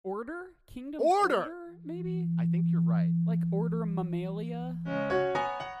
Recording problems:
background music; very loud; from 2.5 s on; 3 dB above the speech

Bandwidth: 15 kHz